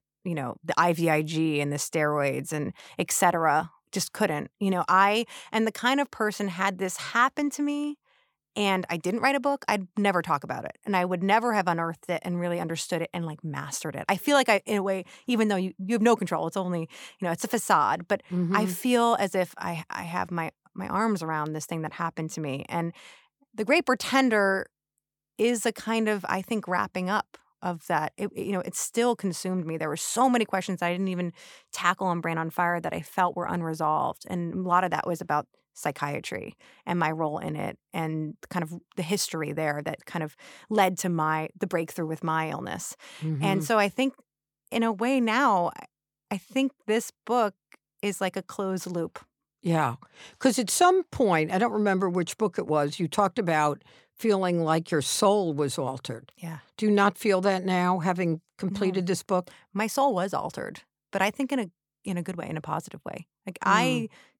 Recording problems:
none

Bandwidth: 18.5 kHz